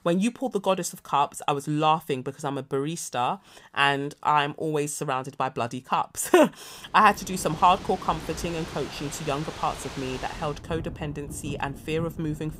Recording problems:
rain or running water; noticeable; from 7 s on; 15 dB below the speech

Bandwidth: 15.5 kHz